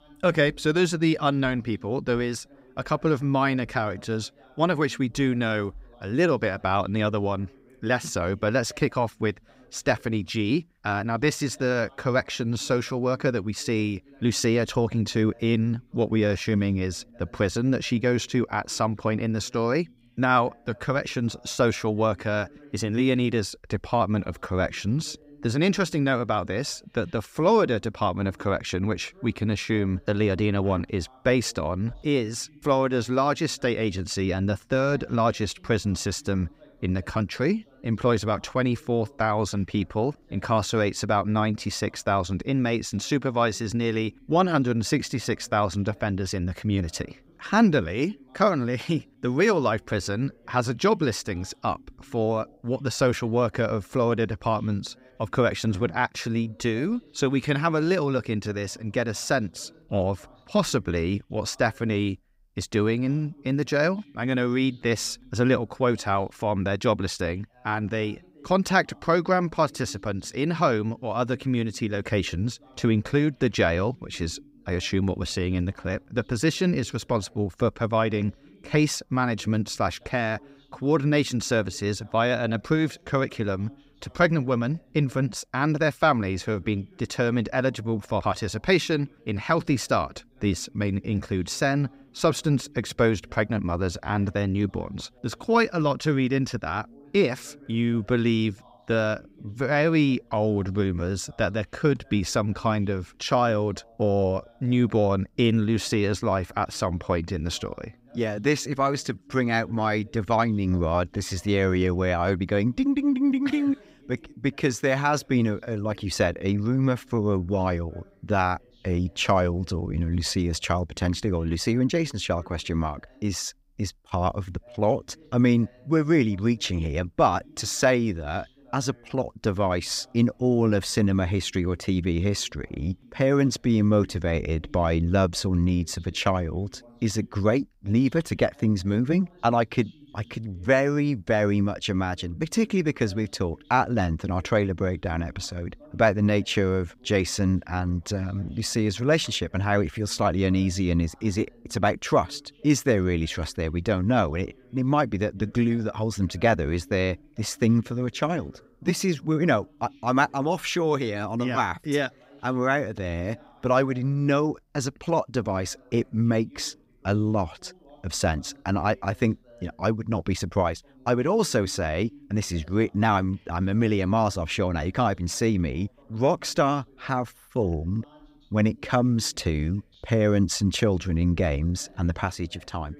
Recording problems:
voice in the background; faint; throughout; 30 dB below the speech

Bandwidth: 15.5 kHz